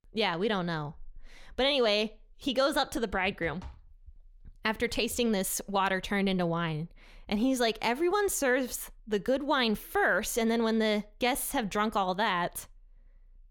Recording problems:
none

